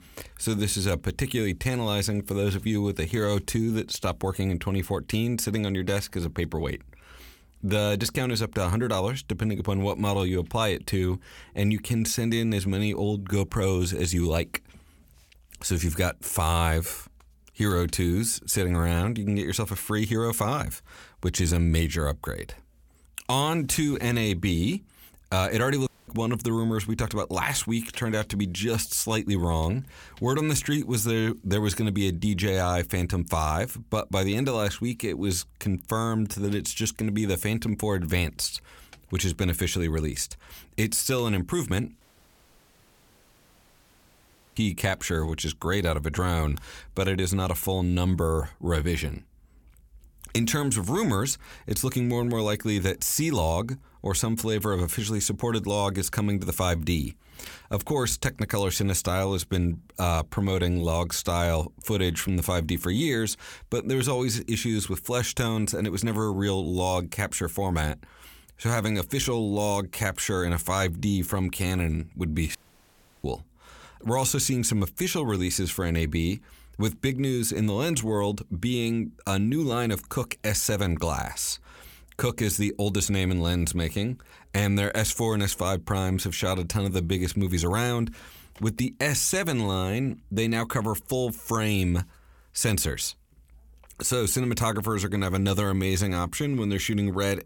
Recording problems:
audio cutting out; at 26 s, at 42 s for 2.5 s and at 1:13 for 0.5 s

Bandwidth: 17 kHz